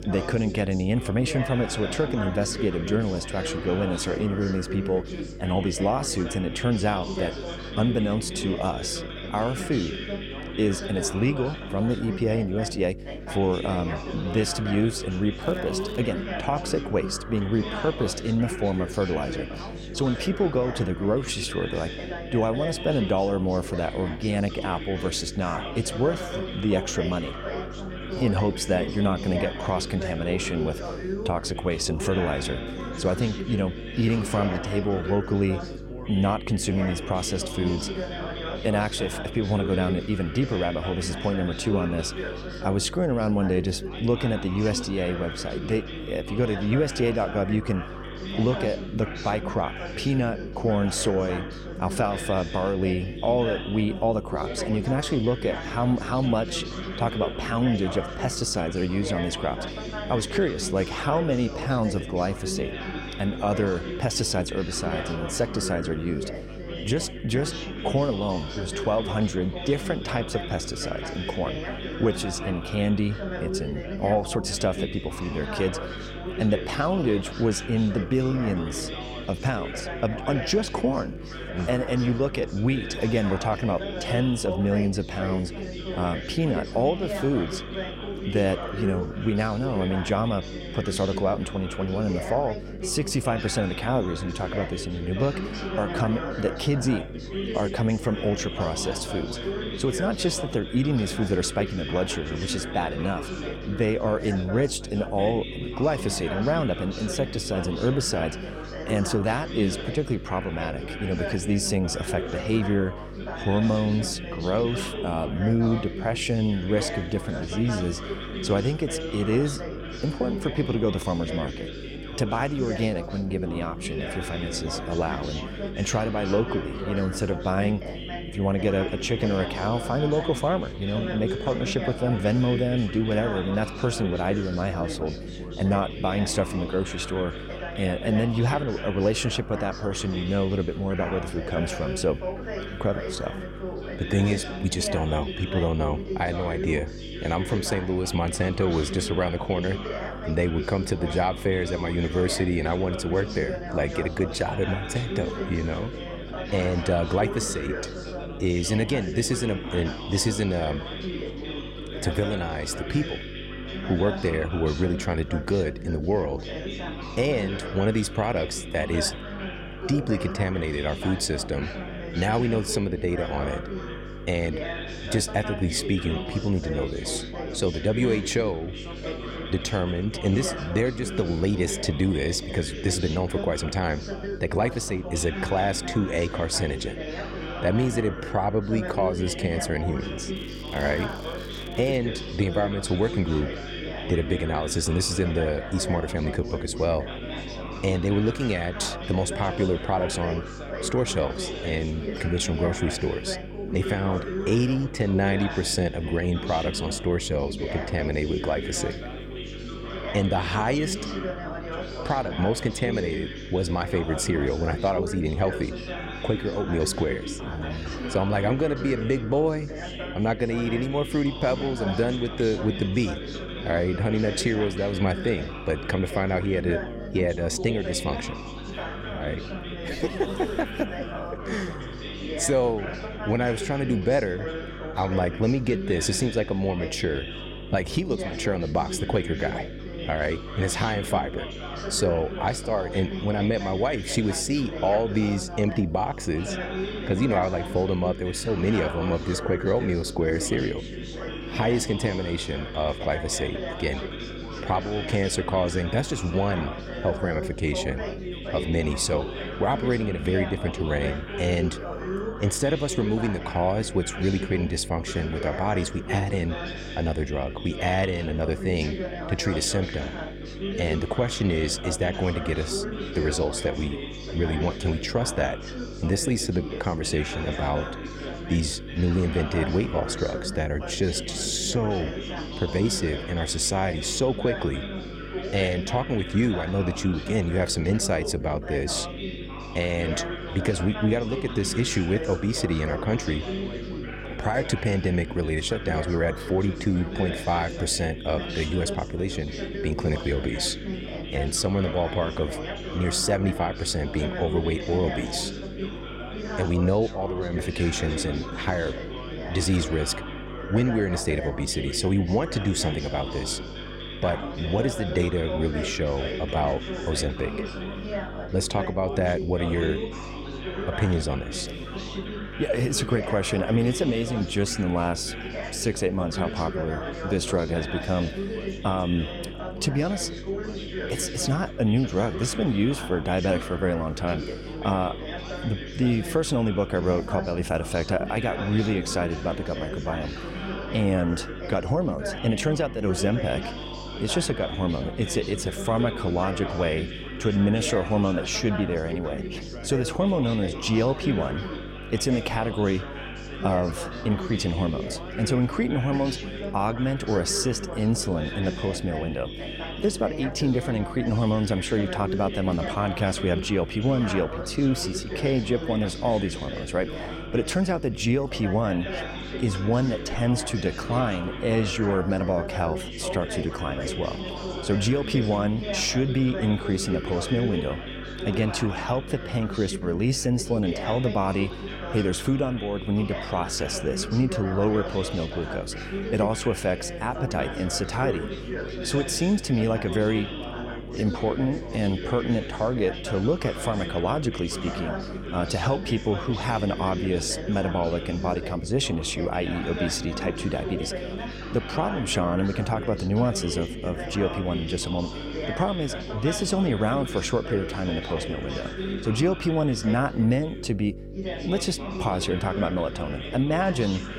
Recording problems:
background chatter; loud; throughout; 3 voices, 8 dB below the speech
electrical hum; noticeable; throughout; 50 Hz, 15 dB below the speech
crackling; faint; at 15 s and from 3:10 to 3:12; 25 dB below the speech

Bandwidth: 16 kHz